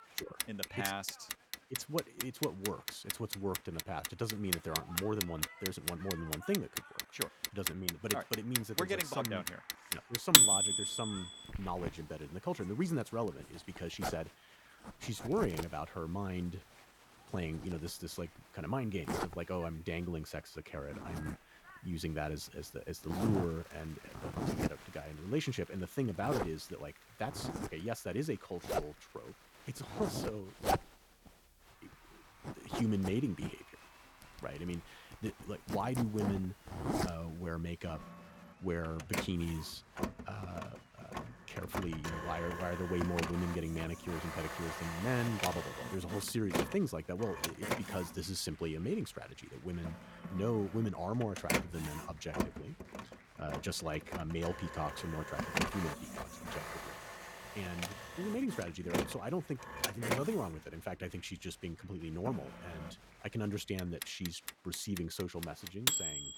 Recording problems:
household noises; very loud; throughout; 3 dB above the speech
crowd noise; noticeable; throughout; 20 dB below the speech
uneven, jittery; slightly; from 4 to 14 s

